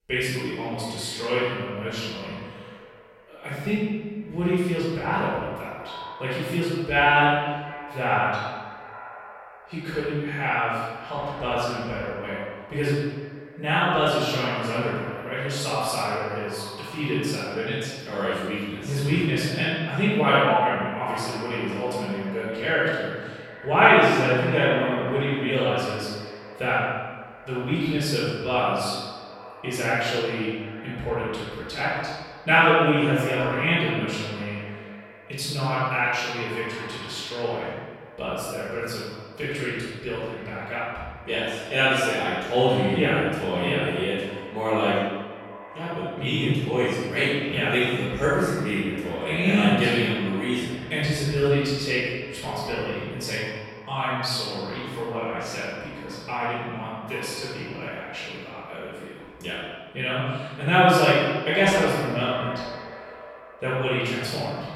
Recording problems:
room echo; strong; dies away in 1.2 s
off-mic speech; far
echo of what is said; noticeable; throughout; 350 ms later, 15 dB below the speech

